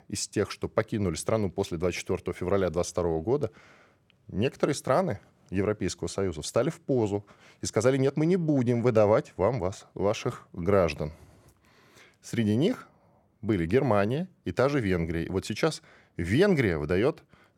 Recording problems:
none

